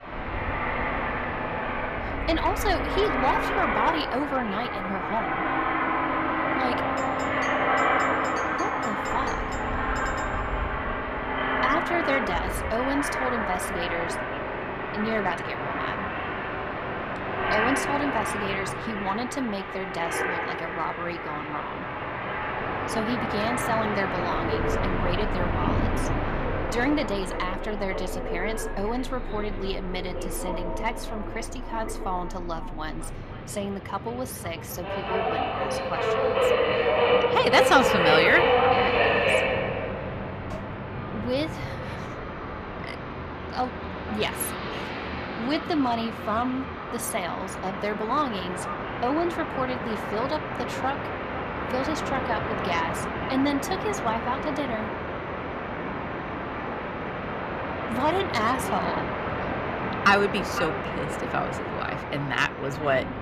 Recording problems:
echo of what is said; noticeable; throughout; 510 ms later, 15 dB below the speech
train or aircraft noise; very loud; throughout; 1 dB above the speech
doorbell; faint; from 7 to 10 s; peak 10 dB below the speech
clattering dishes; faint; at 41 s; peak 15 dB below the speech

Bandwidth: 14.5 kHz